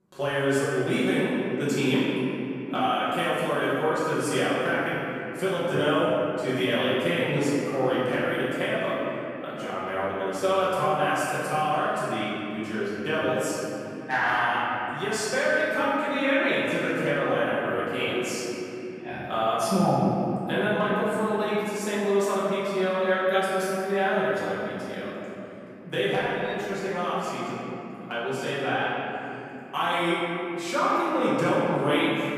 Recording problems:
room echo; strong; dies away in 3 s
off-mic speech; far

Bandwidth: 14.5 kHz